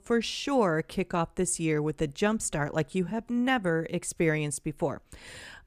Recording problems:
none

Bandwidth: 14.5 kHz